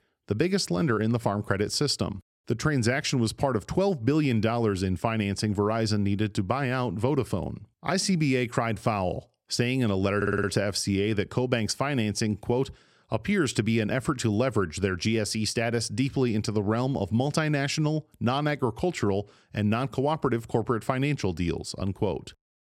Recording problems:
audio stuttering; at 10 s

